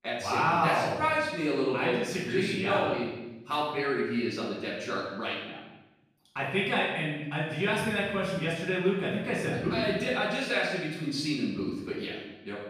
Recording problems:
off-mic speech; far
room echo; noticeable; dies away in 1 s

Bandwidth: 15 kHz